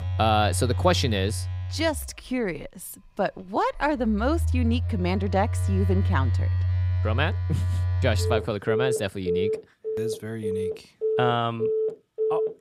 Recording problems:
alarms or sirens; very loud; throughout; as loud as the speech

